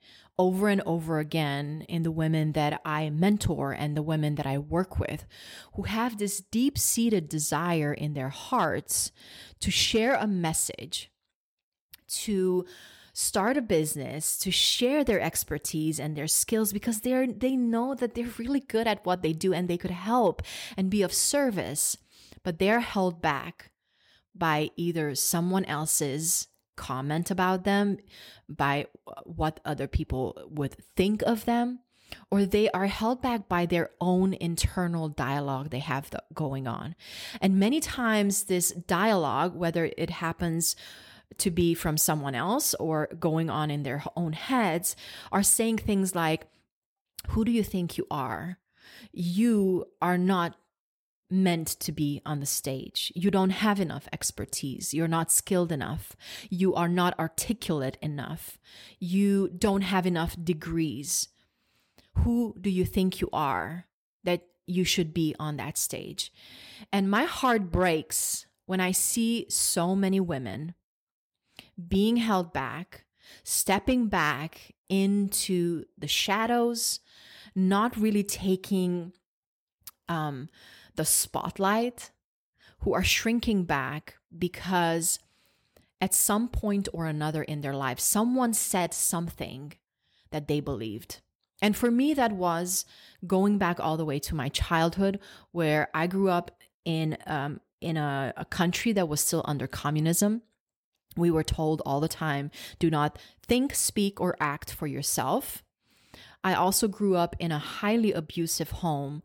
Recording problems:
none

